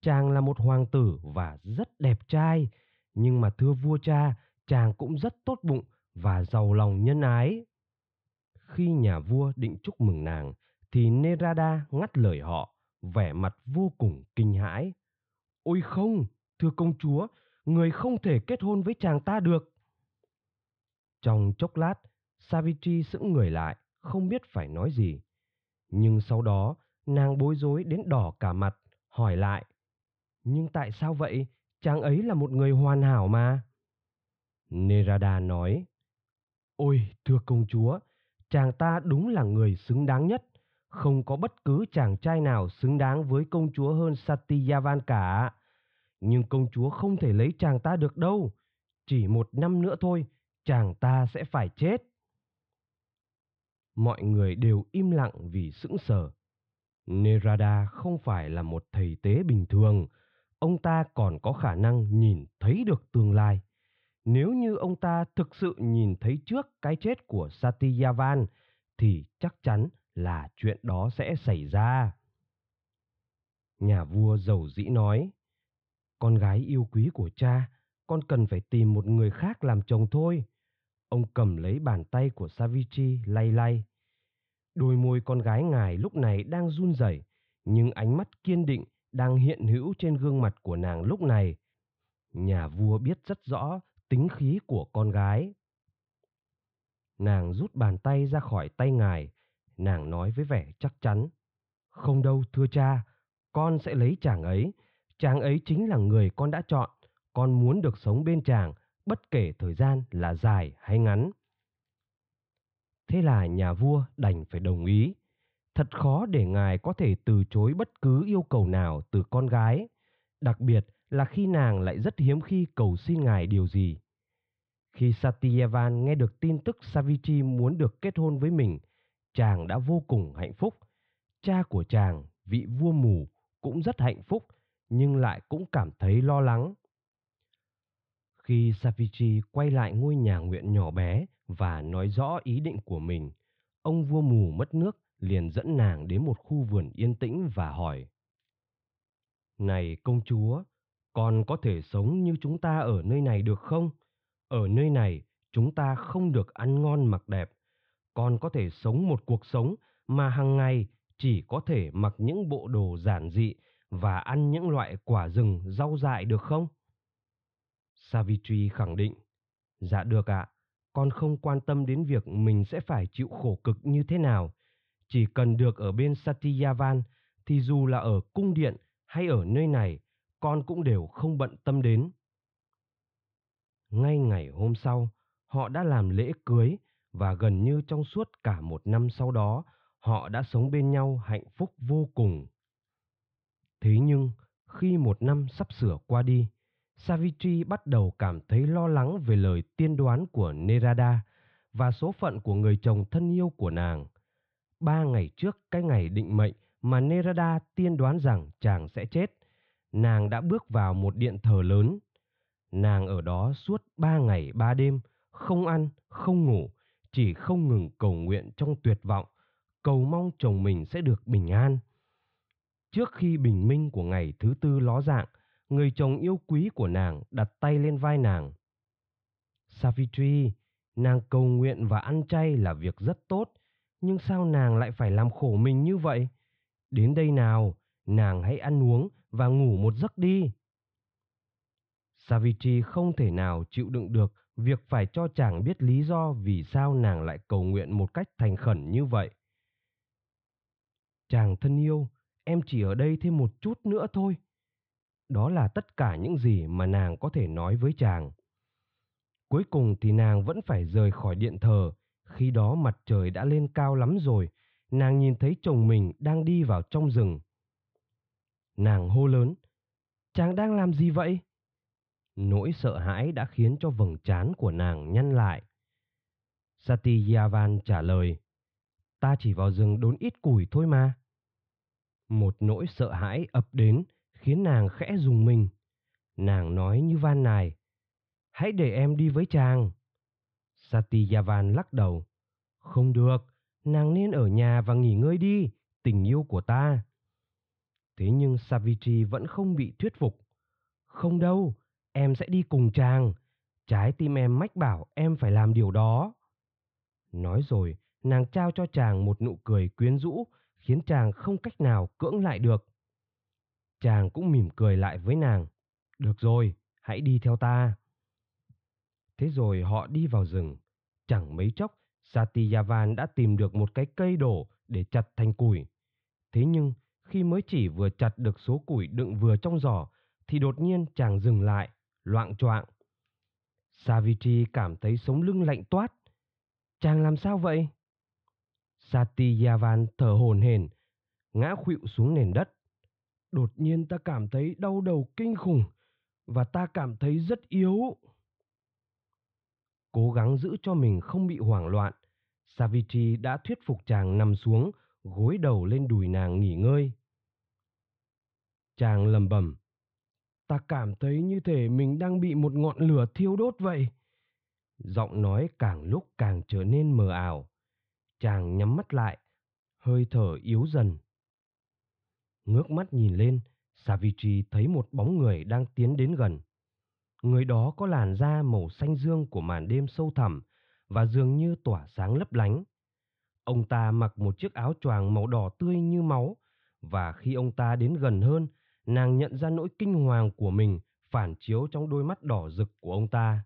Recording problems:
muffled; very; fading above 3.5 kHz

